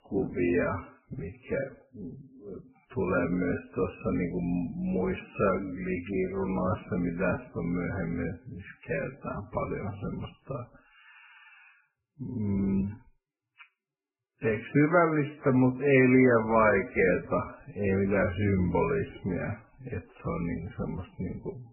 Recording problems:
garbled, watery; badly; nothing above 2.5 kHz
wrong speed, natural pitch; too slow; 0.5 times normal speed

